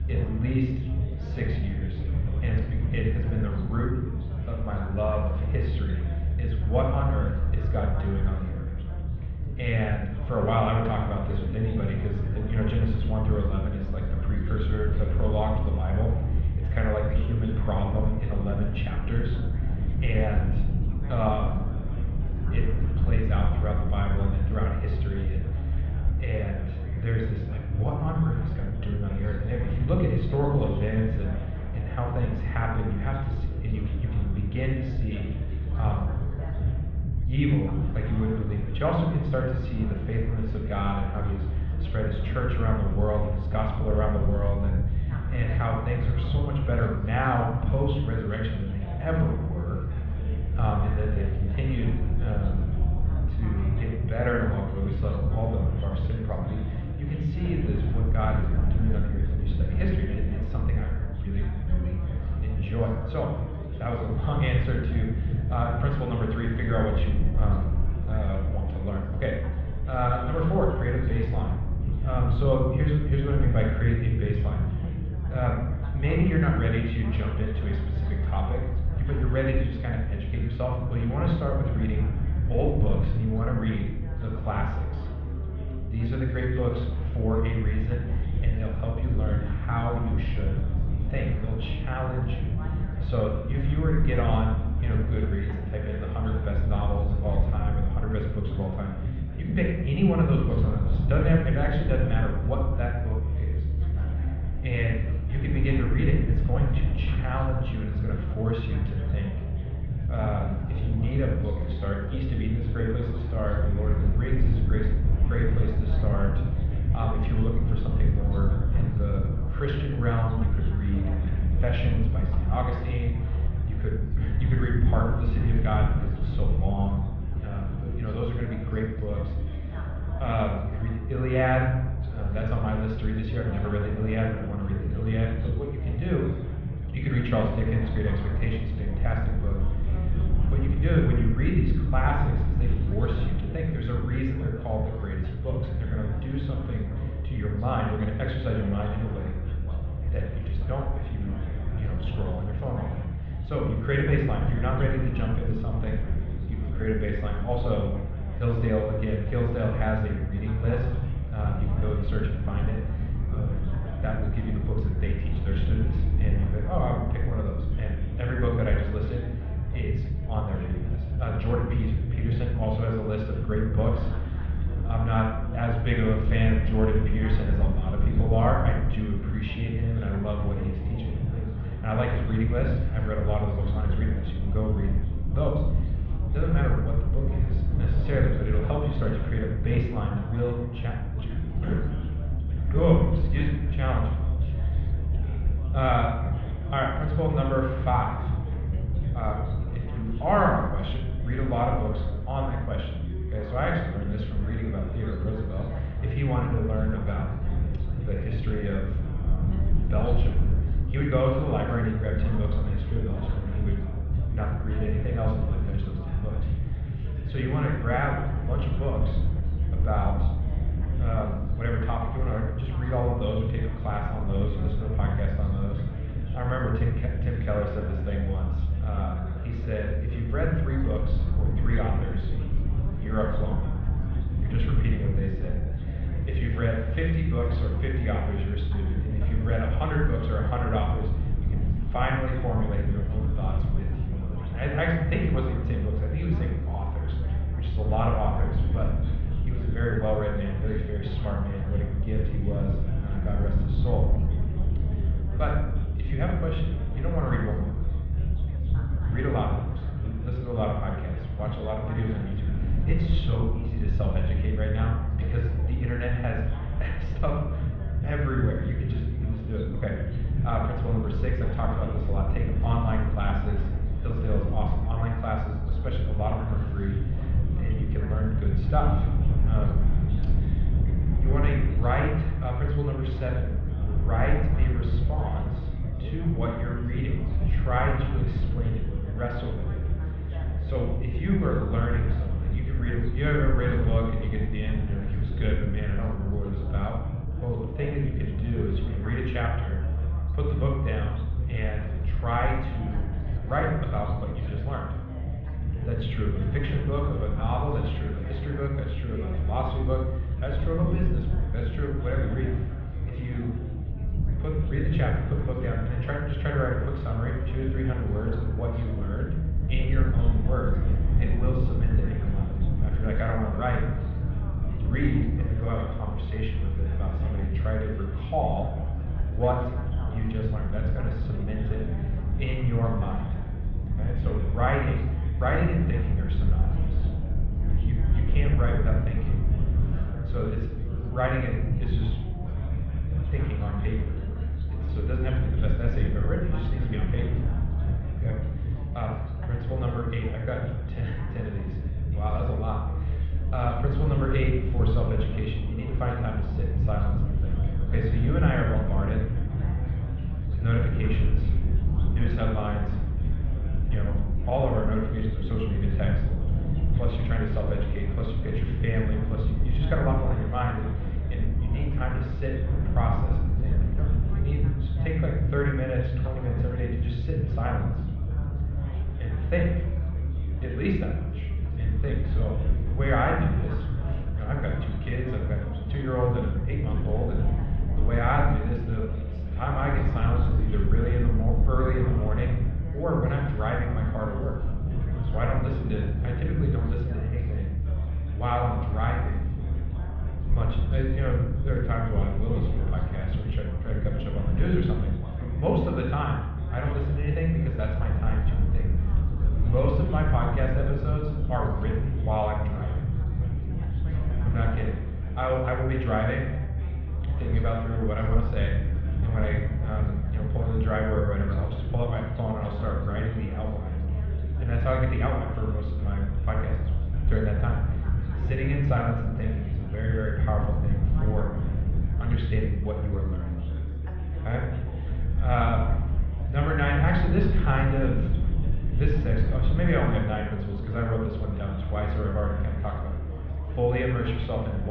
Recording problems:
muffled; very; fading above 3.5 kHz
room echo; noticeable; dies away in 0.9 s
off-mic speech; somewhat distant
chatter from many people; noticeable; throughout; 15 dB below the speech
low rumble; noticeable; throughout; 10 dB below the speech
abrupt cut into speech; at the end

